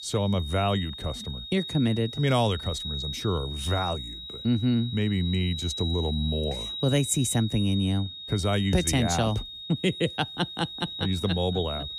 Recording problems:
high-pitched whine; loud; throughout; 4 kHz, 8 dB below the speech

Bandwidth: 15 kHz